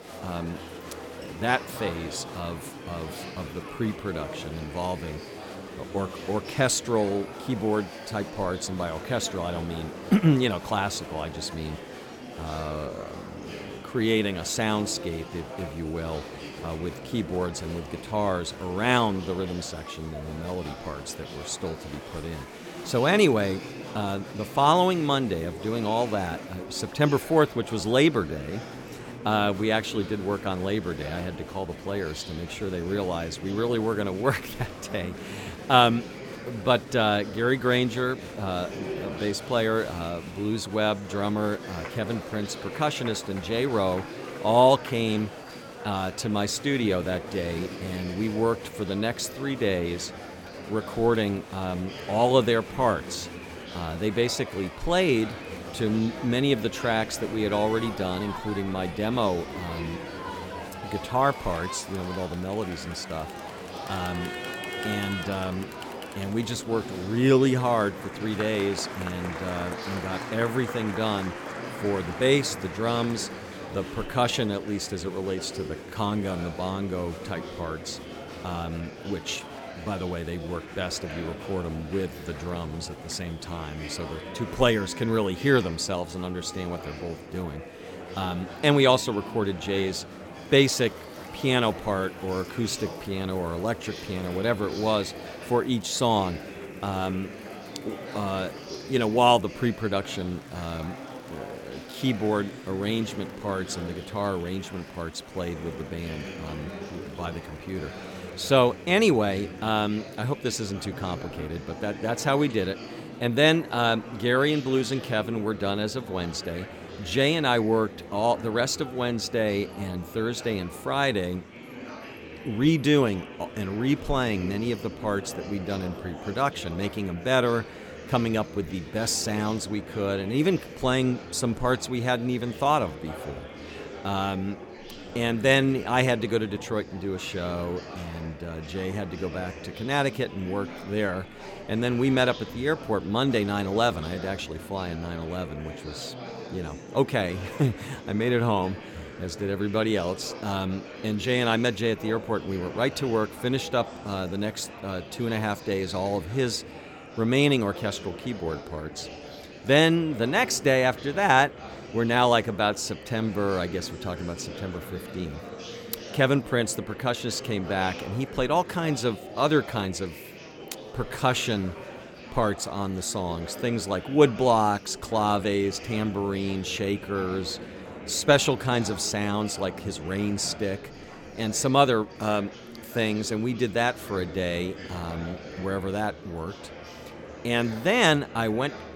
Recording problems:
murmuring crowd; noticeable; throughout; 10 dB below the speech

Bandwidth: 17 kHz